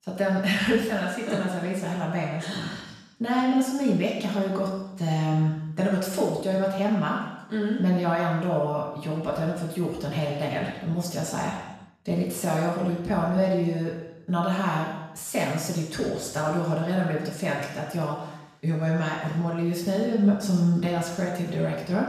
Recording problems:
off-mic speech; far
room echo; noticeable; dies away in 0.9 s

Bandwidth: 14 kHz